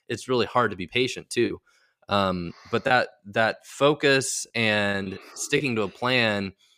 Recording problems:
choppy; occasionally; at 0.5 s; 4% of the speech affected

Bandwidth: 15 kHz